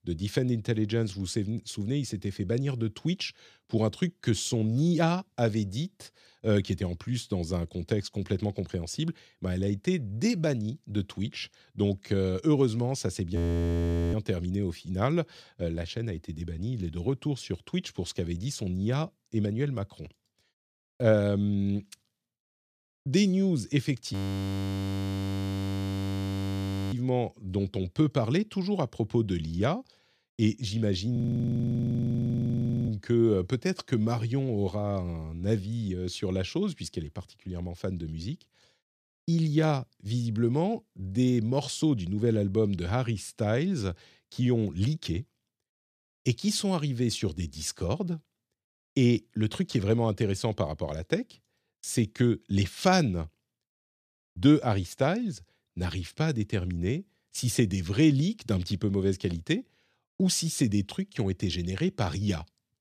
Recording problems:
audio freezing; at 13 s for 1 s, at 24 s for 3 s and at 31 s for 1.5 s

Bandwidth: 14.5 kHz